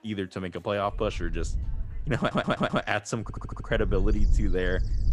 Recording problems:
wind noise on the microphone; occasional gusts; from 1 to 2.5 s and from 3.5 s on; 20 dB below the speech
animal sounds; faint; throughout; 30 dB below the speech
audio stuttering; at 2 s and at 3 s

